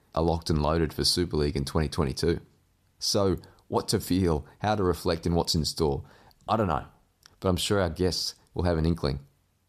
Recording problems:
none

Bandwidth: 14.5 kHz